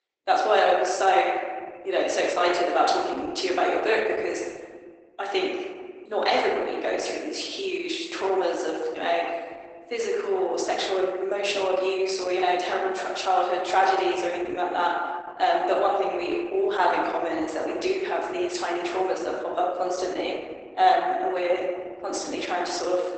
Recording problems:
garbled, watery; badly; nothing above 8 kHz
thin; very; fading below 300 Hz
room echo; noticeable; dies away in 1.3 s
off-mic speech; somewhat distant

